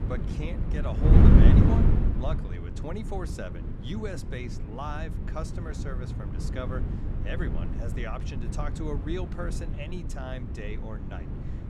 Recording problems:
wind noise on the microphone; heavy; 1 dB above the speech

